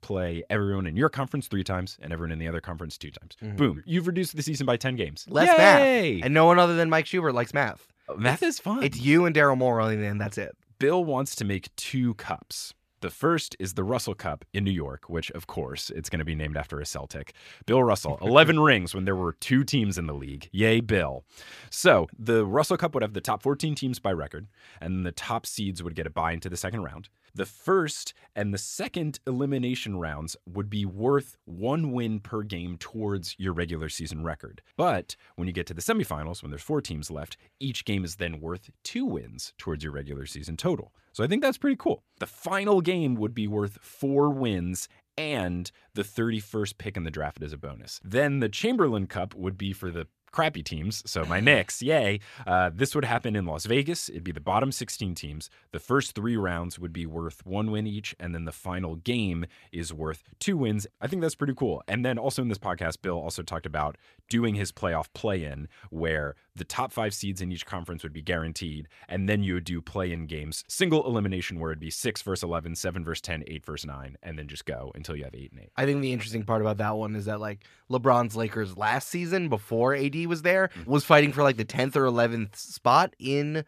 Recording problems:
none

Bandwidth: 14.5 kHz